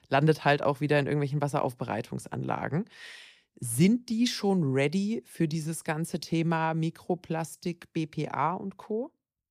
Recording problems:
none

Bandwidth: 15 kHz